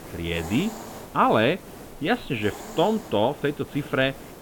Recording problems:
high frequencies cut off; severe; nothing above 4 kHz
hiss; noticeable; throughout; 15 dB below the speech

